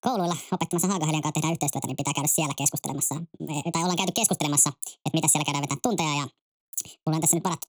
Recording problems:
wrong speed and pitch; too fast and too high; 1.6 times normal speed

